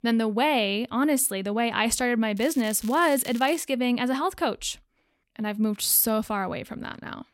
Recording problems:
crackling; faint; from 2.5 to 3.5 s; 20 dB below the speech

